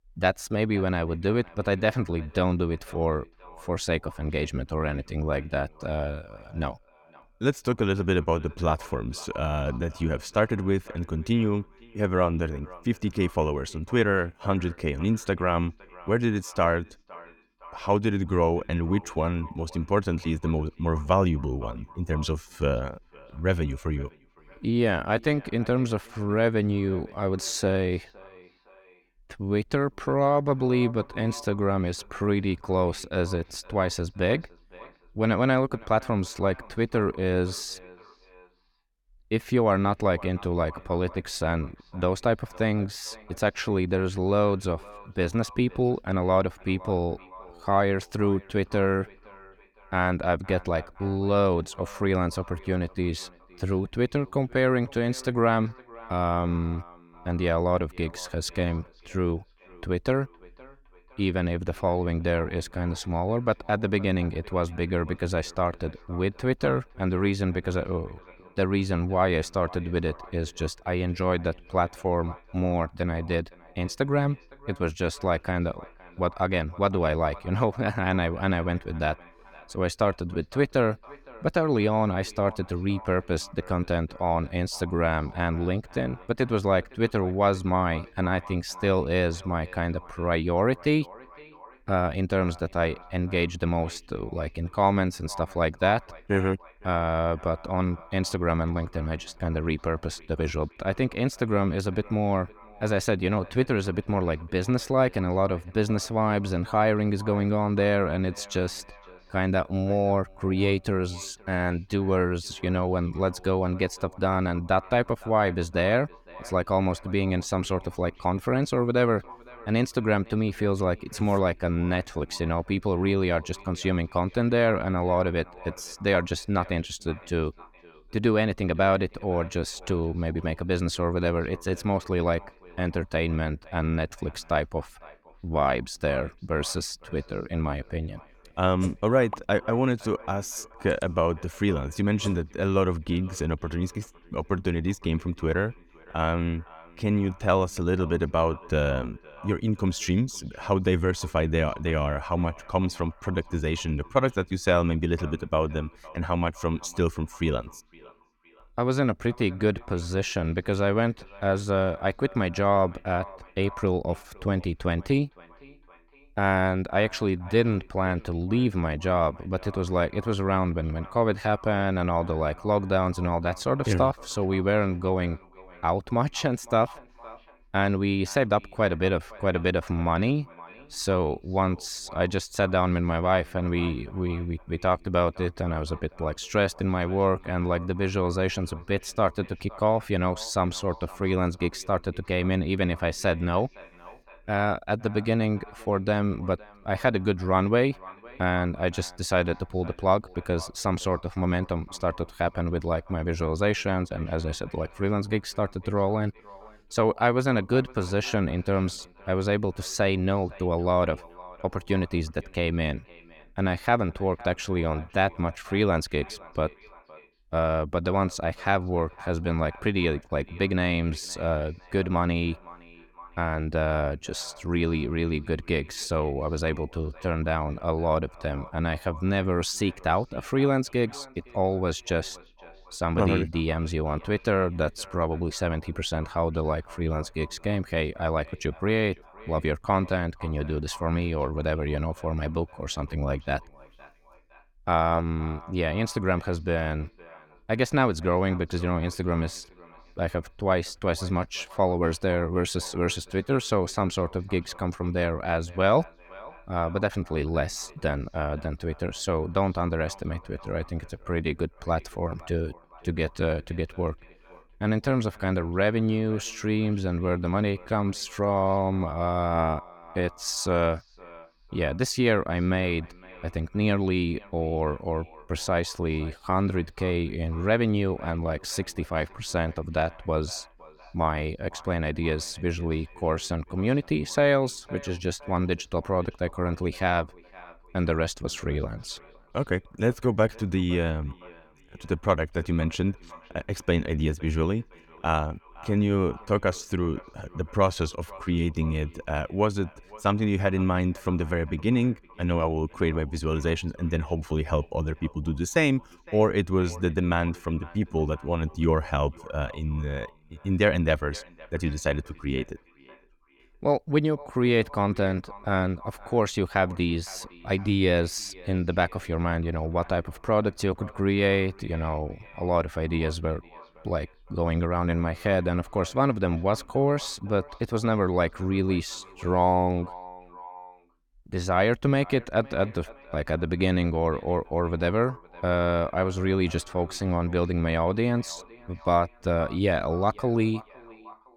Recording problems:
echo of what is said; faint; throughout; 510 ms later, 20 dB below the speech

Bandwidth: 18 kHz